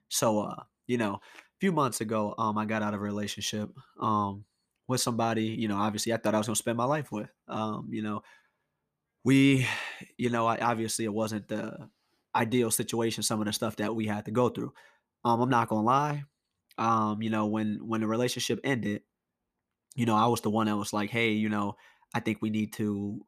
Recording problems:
none

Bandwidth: 14.5 kHz